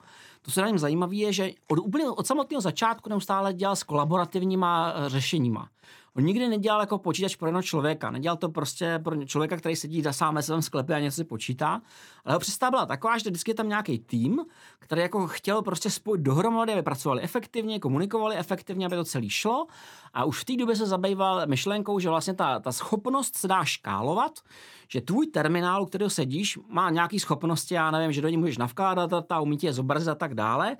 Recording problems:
none

